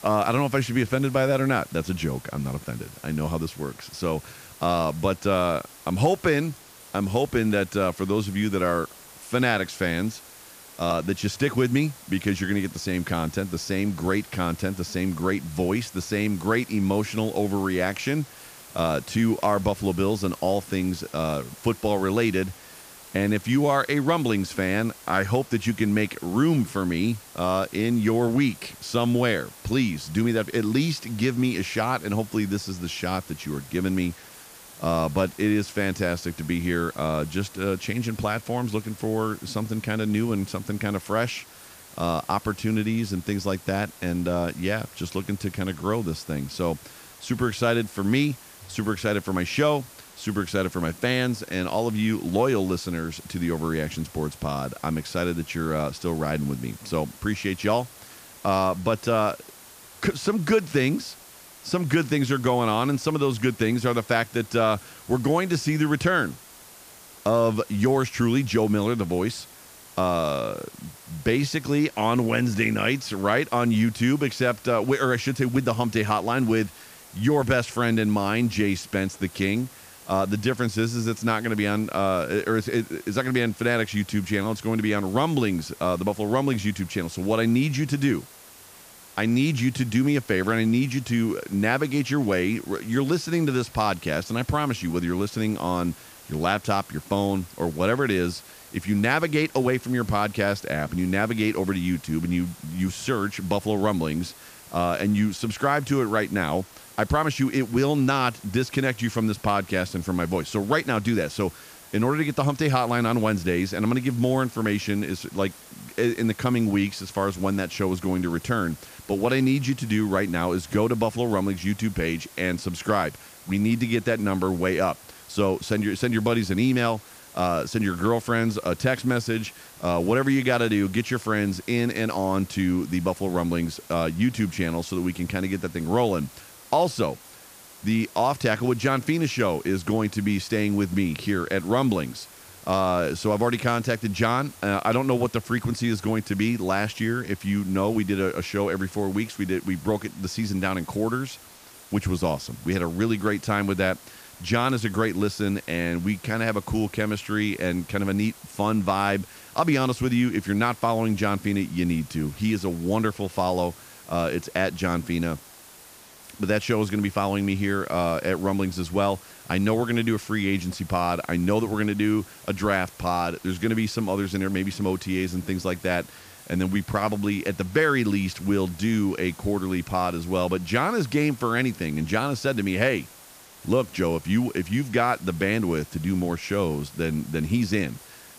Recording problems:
hiss; noticeable; throughout; 20 dB below the speech

